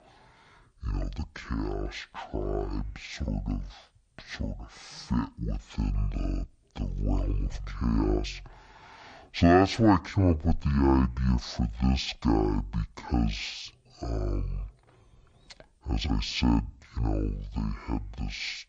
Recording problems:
wrong speed and pitch; too slow and too low; 0.5 times normal speed

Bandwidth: 9 kHz